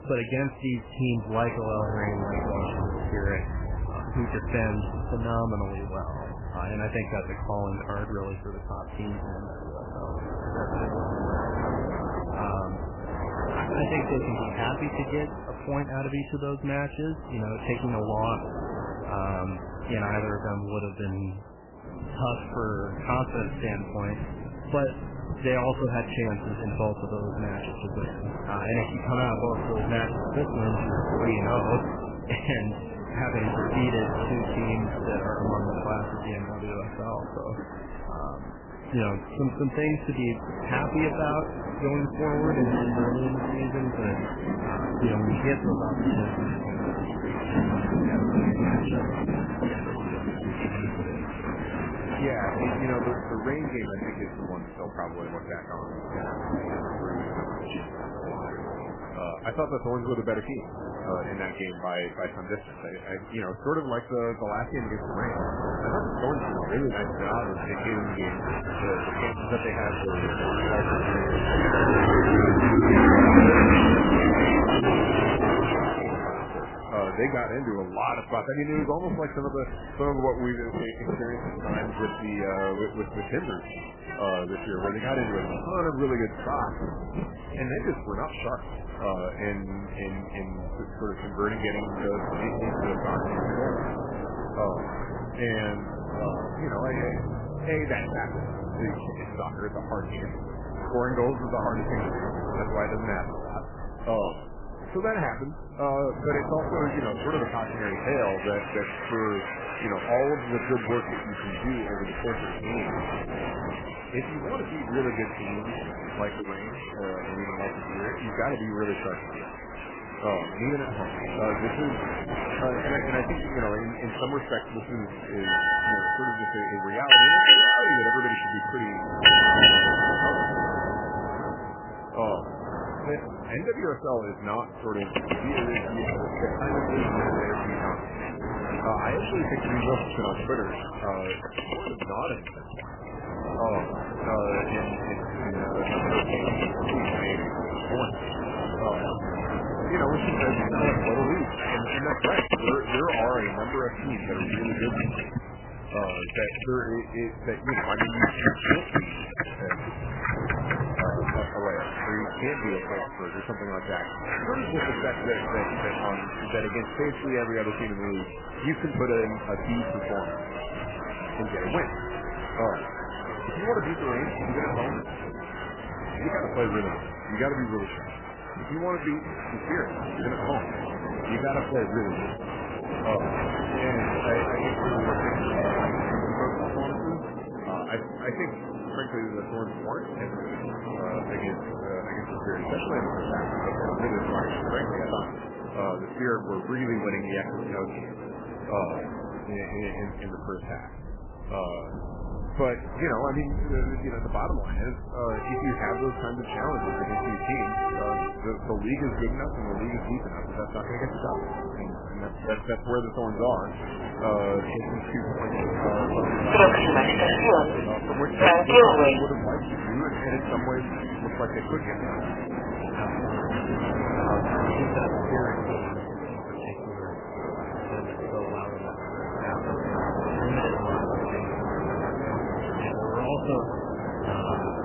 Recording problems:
garbled, watery; badly; nothing above 3 kHz
train or aircraft noise; very loud; throughout; 3 dB above the speech

